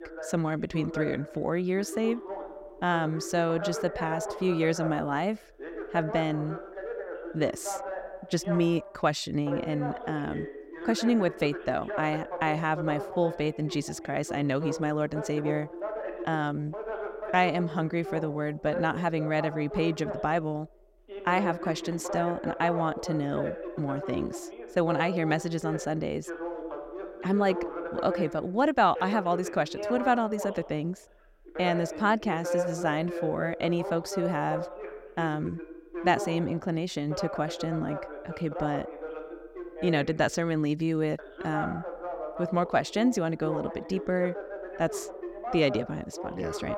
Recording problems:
voice in the background; loud; throughout; 8 dB below the speech

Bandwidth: 16 kHz